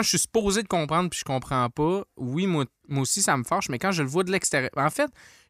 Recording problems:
abrupt cut into speech; at the start

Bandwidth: 15 kHz